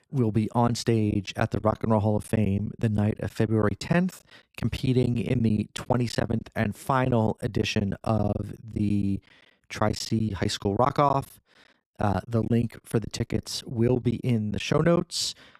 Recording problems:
choppy; very; 11% of the speech affected

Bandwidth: 14.5 kHz